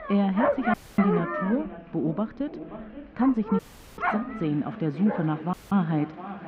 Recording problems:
muffled; very; fading above 2.5 kHz
echo of what is said; noticeable; throughout; 530 ms later, 15 dB below the speech
animal sounds; loud; throughout; 3 dB below the speech
murmuring crowd; faint; throughout; 25 dB below the speech
audio cutting out; at 0.5 s, at 3.5 s and at 5.5 s

